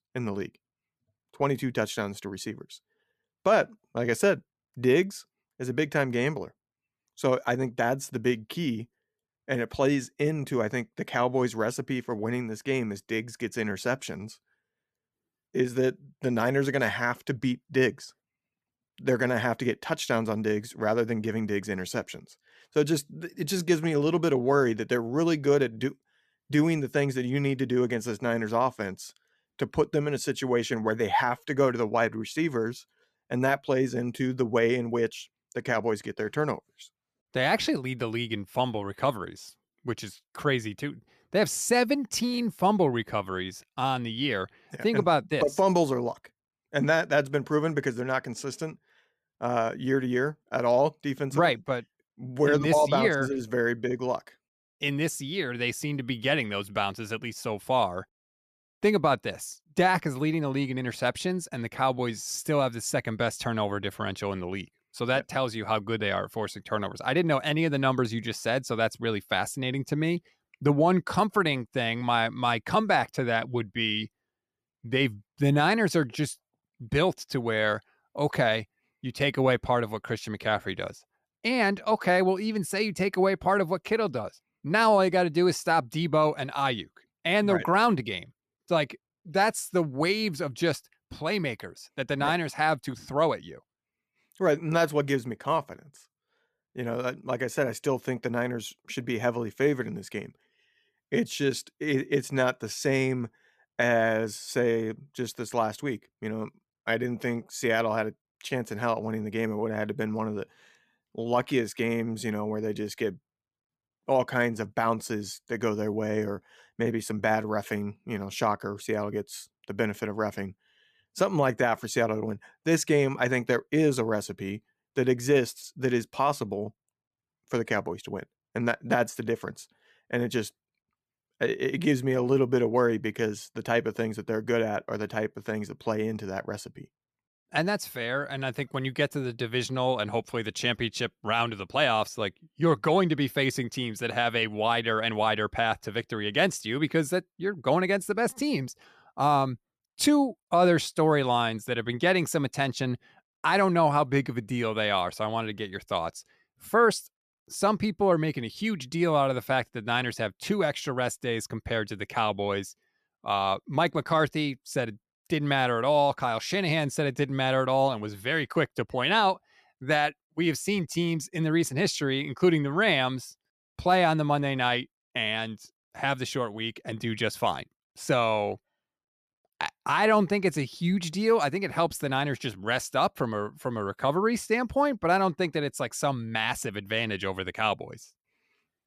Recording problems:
none

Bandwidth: 14.5 kHz